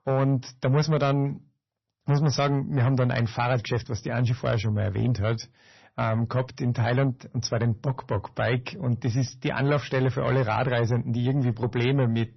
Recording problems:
distortion; slight; 10 dB below the speech
garbled, watery; slightly; nothing above 6 kHz

